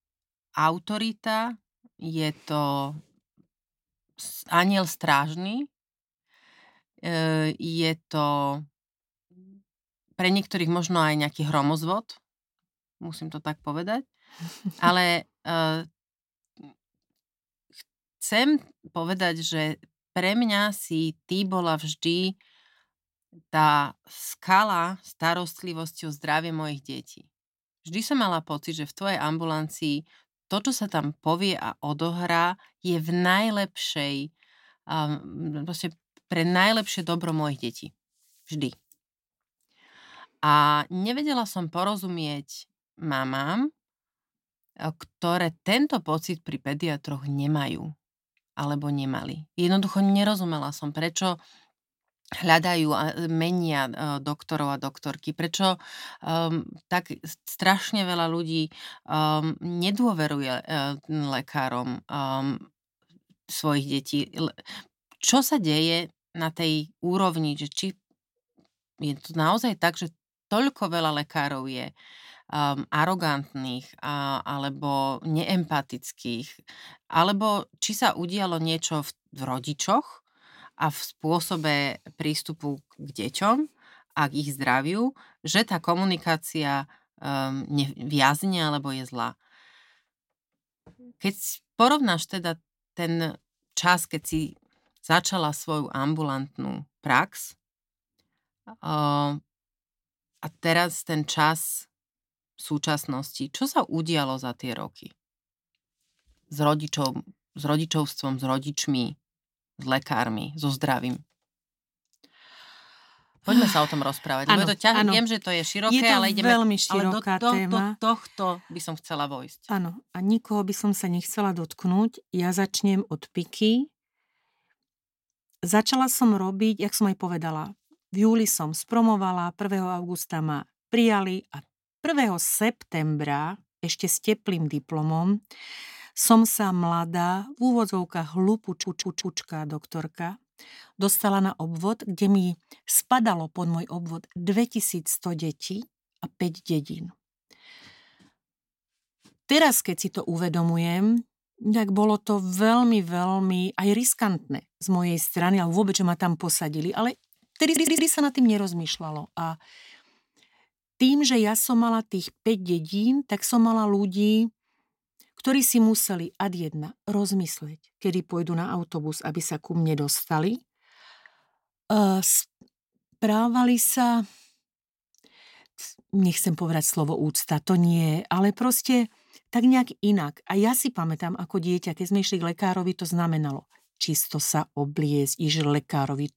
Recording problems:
audio stuttering; at 2:19 and at 2:38

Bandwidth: 16.5 kHz